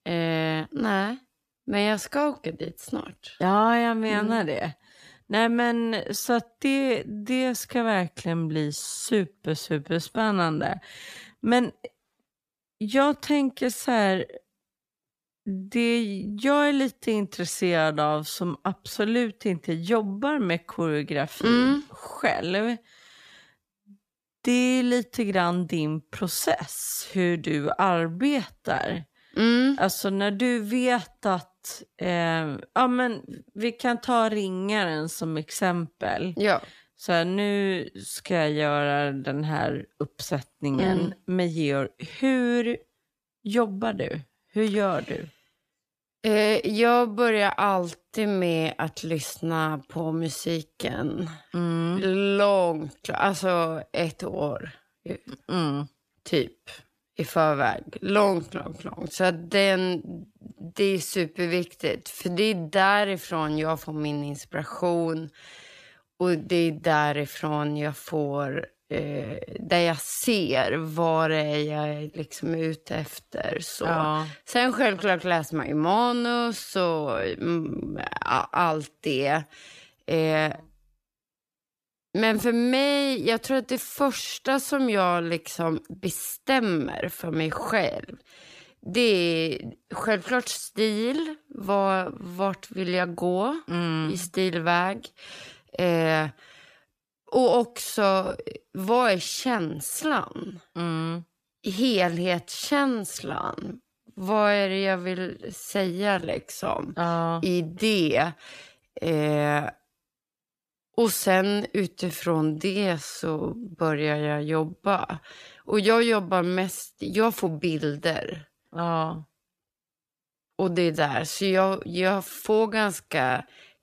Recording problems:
wrong speed, natural pitch; too slow; 0.7 times normal speed

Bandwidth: 14.5 kHz